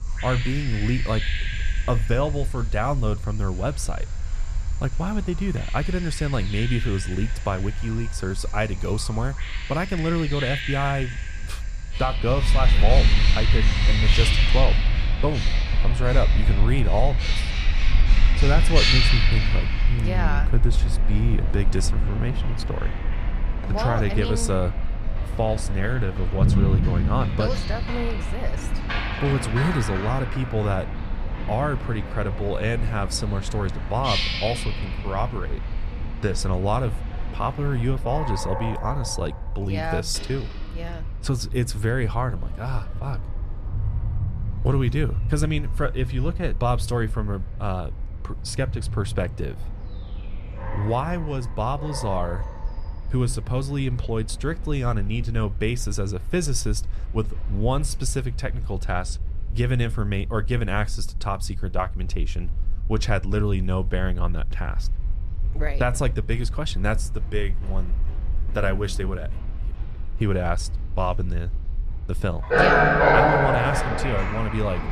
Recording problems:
animal sounds; very loud; throughout; 1 dB above the speech
low rumble; faint; throughout; 25 dB below the speech

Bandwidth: 14.5 kHz